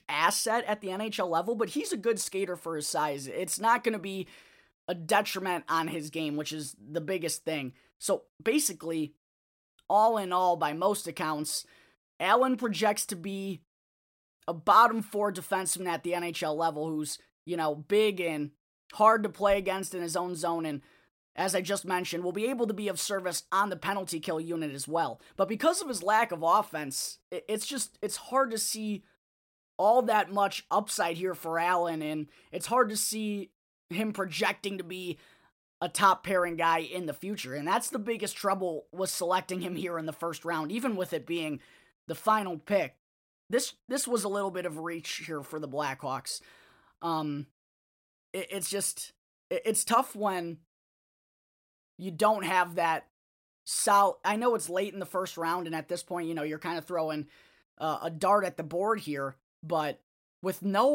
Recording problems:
abrupt cut into speech; at the end

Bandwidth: 16 kHz